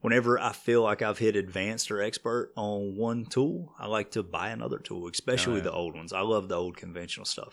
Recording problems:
none

